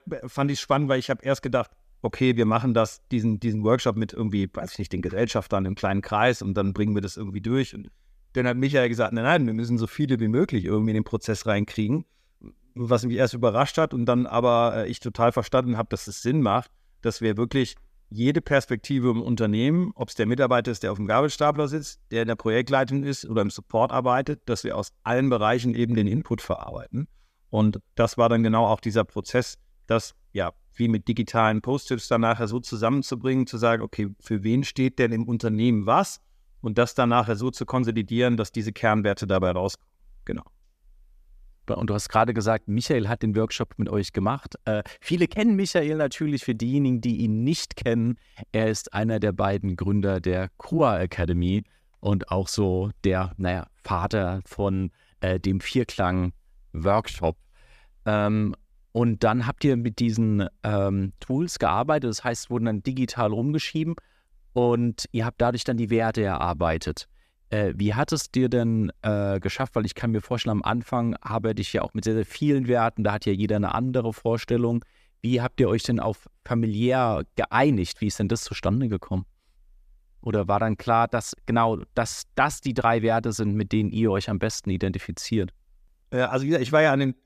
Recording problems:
none

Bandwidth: 14.5 kHz